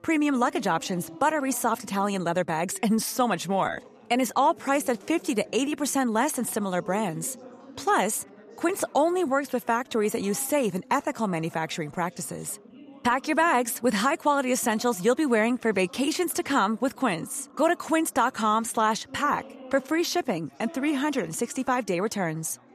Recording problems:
background chatter; faint; throughout; 4 voices, 25 dB below the speech

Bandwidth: 14.5 kHz